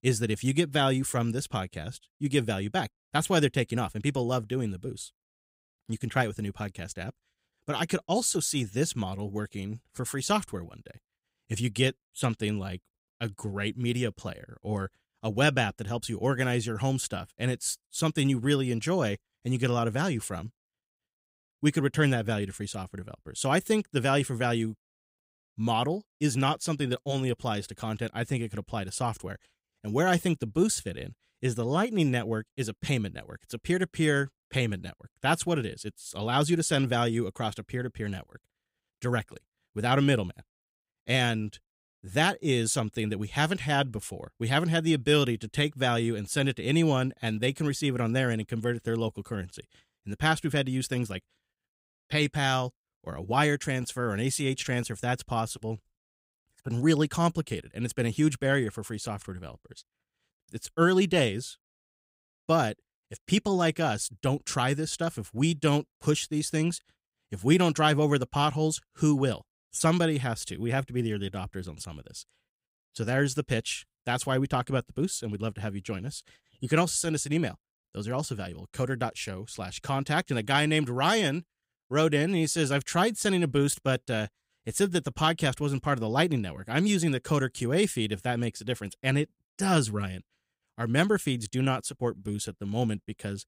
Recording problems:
none

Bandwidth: 15.5 kHz